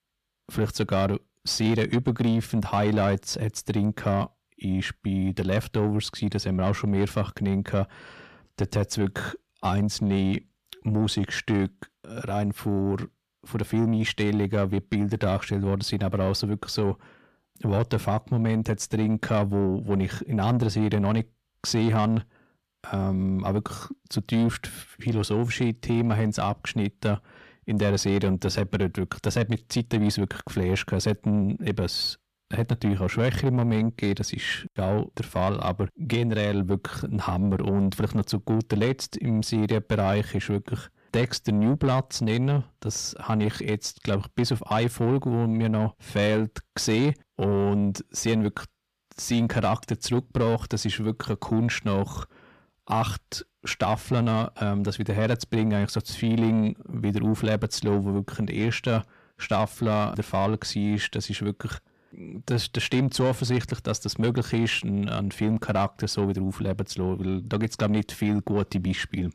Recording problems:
distortion; slight; 10 dB below the speech

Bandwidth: 14.5 kHz